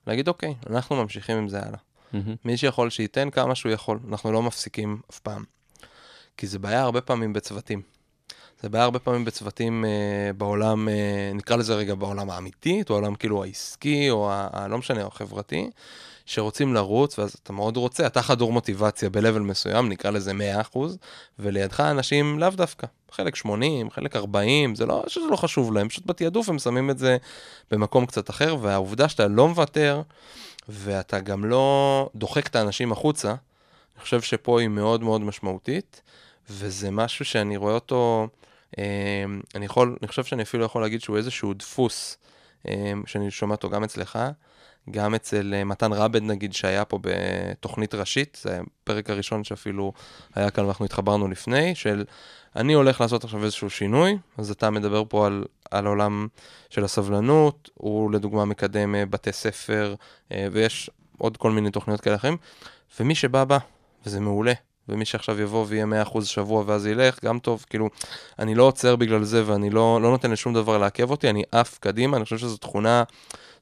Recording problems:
none

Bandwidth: 14 kHz